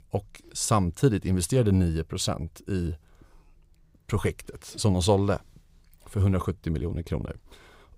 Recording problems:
none

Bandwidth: 15.5 kHz